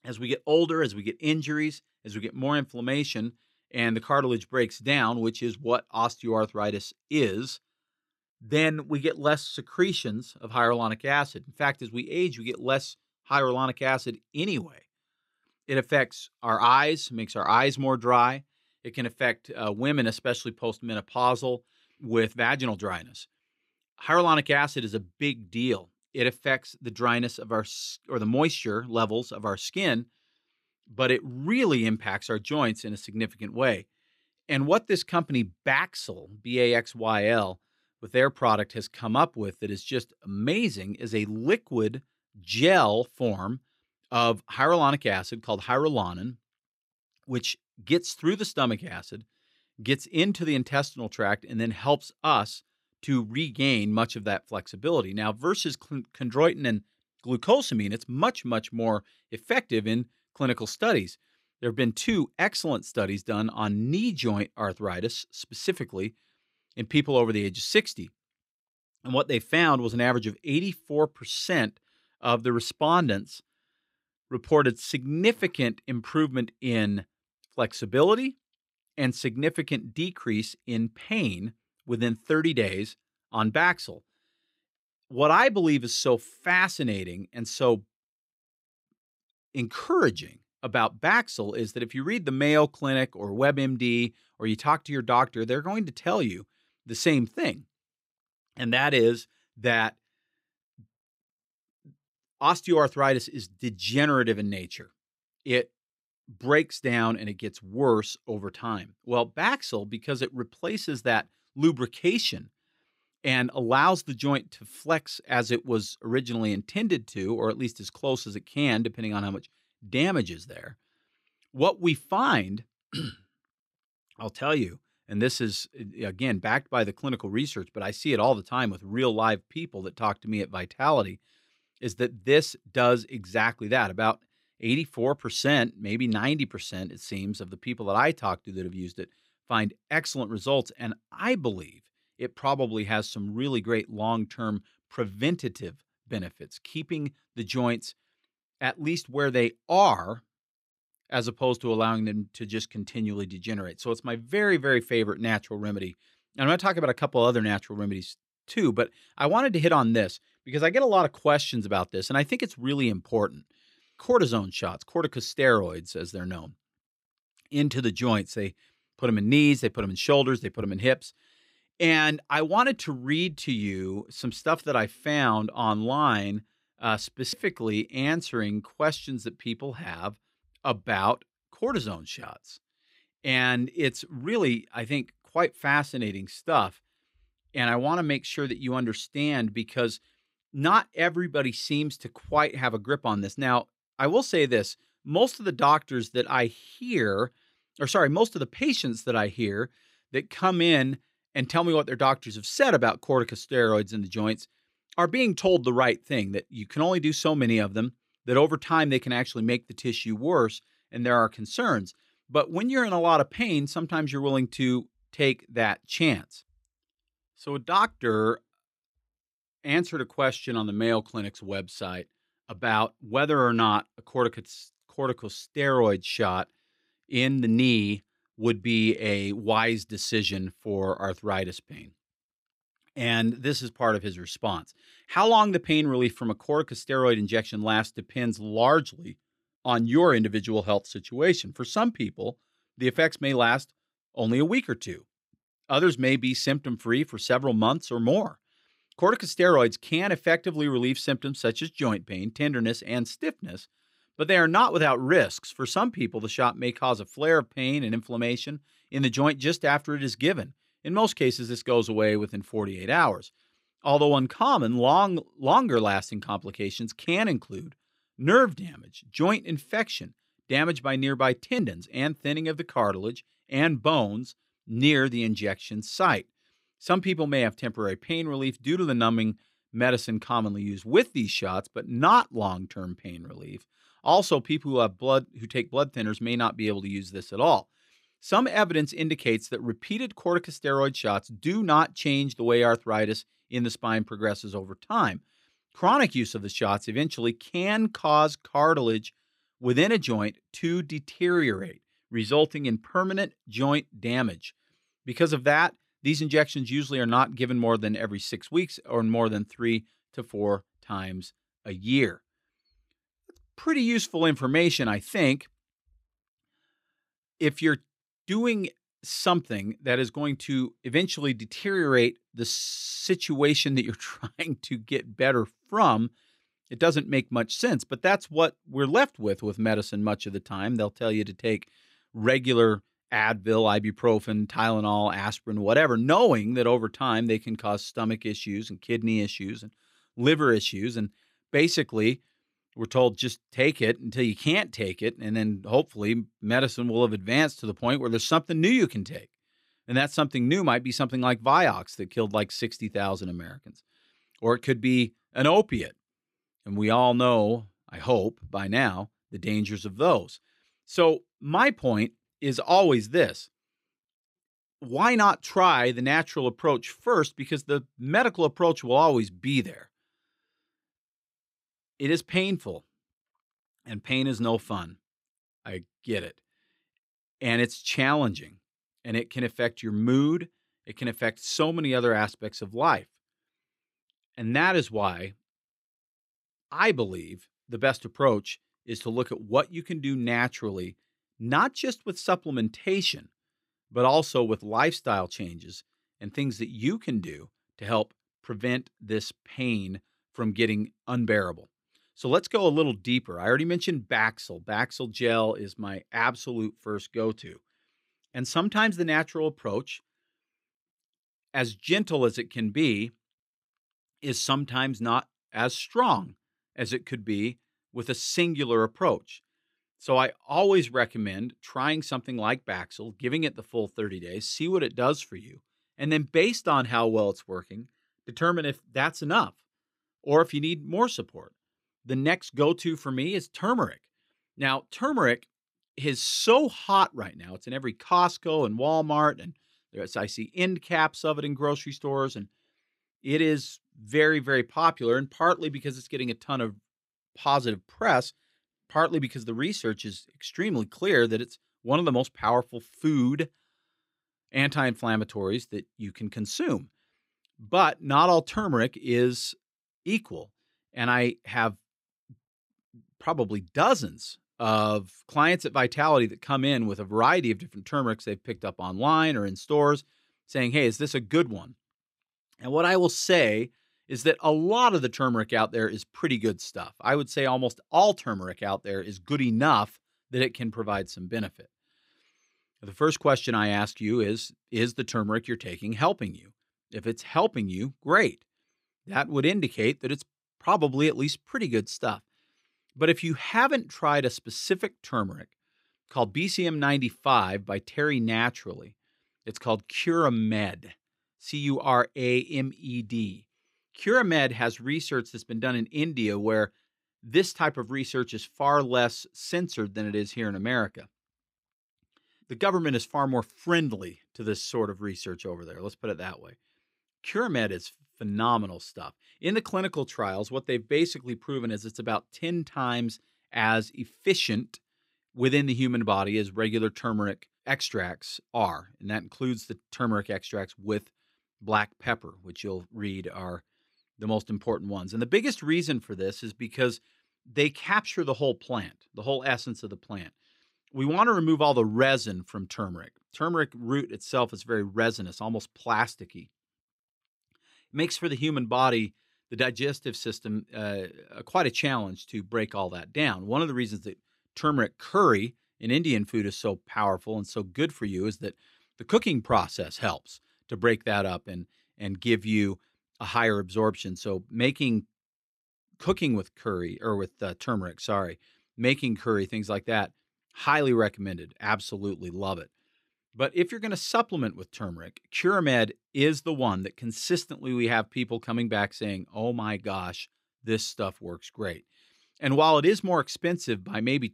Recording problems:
none

